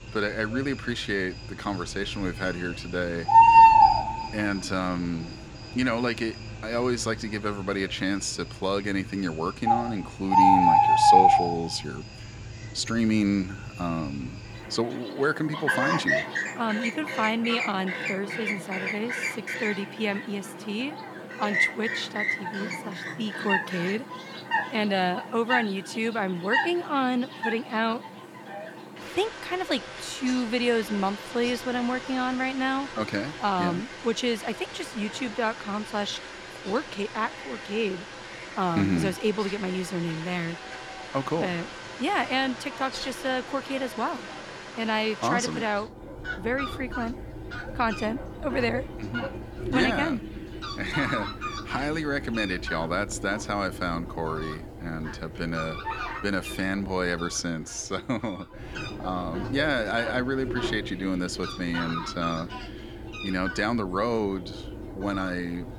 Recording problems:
animal sounds; very loud; throughout; 1 dB above the speech

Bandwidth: 18.5 kHz